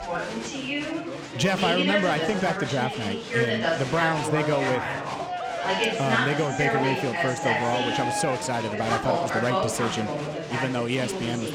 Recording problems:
chatter from many people; very loud; throughout; as loud as the speech

